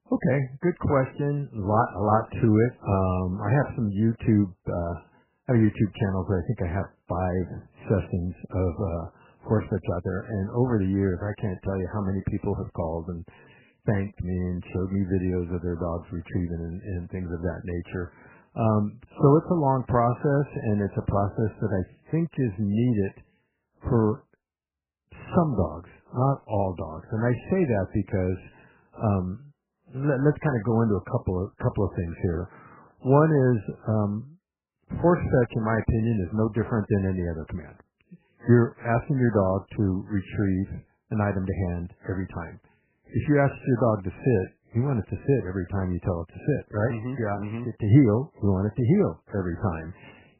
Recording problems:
garbled, watery; badly; nothing above 3 kHz

